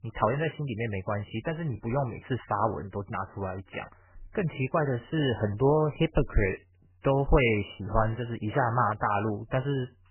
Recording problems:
garbled, watery; badly; nothing above 3 kHz

